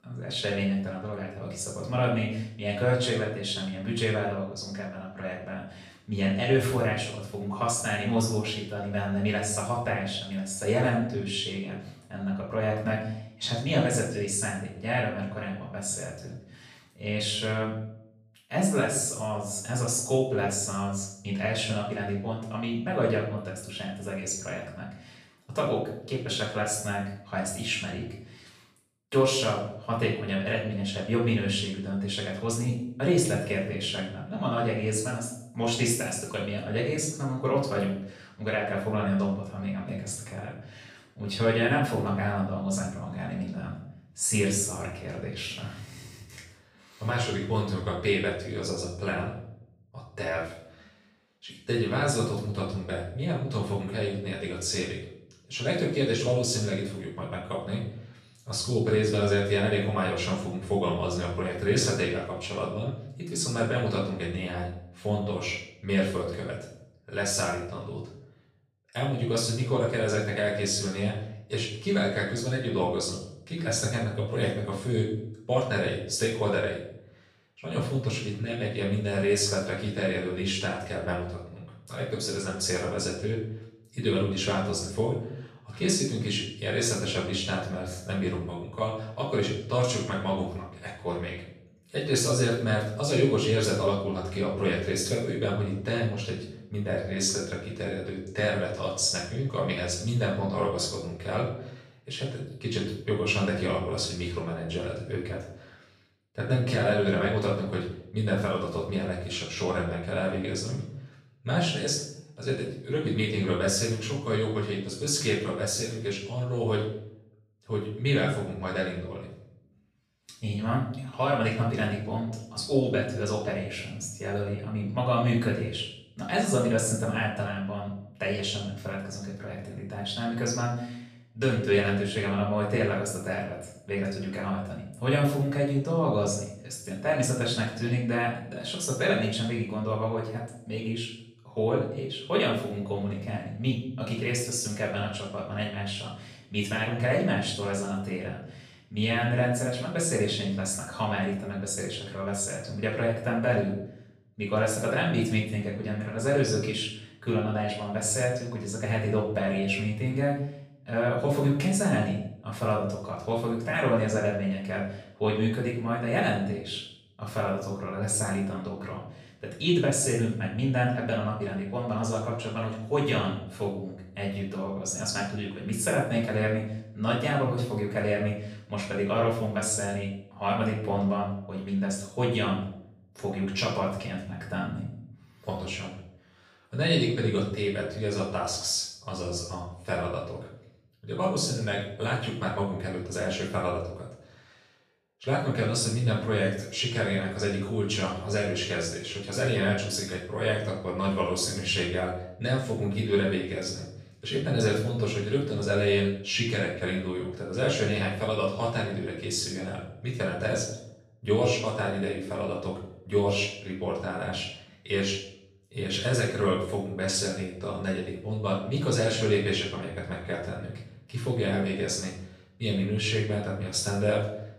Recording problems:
off-mic speech; far
room echo; noticeable; dies away in 0.6 s

